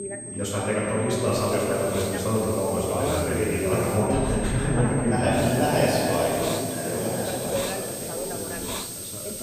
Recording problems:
room echo; strong; dies away in 2.4 s
off-mic speech; far
high-pitched whine; loud; throughout; 8.5 kHz, 10 dB below the speech
background chatter; loud; throughout; 2 voices, 8 dB below the speech
hiss; noticeable; from 1.5 to 4 s and from 5.5 s on; 10 dB below the speech

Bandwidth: 15 kHz